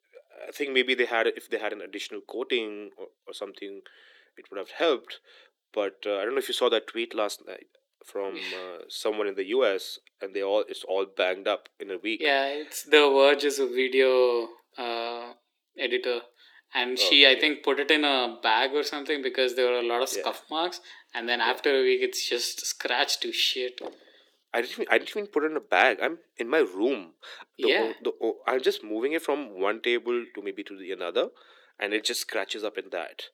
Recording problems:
thin; somewhat; fading below 300 Hz
door banging; faint; at 24 s; peak 15 dB below the speech

